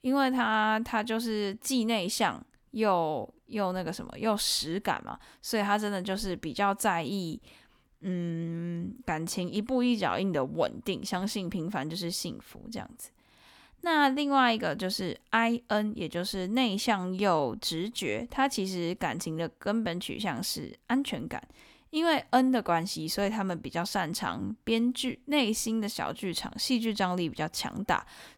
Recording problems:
none

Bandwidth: 18.5 kHz